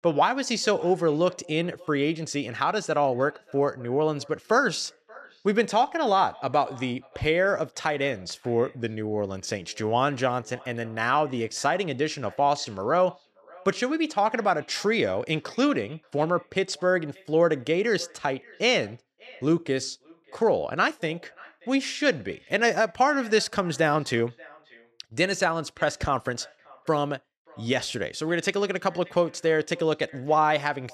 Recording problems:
echo of what is said; faint; throughout; 580 ms later, 25 dB below the speech

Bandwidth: 13.5 kHz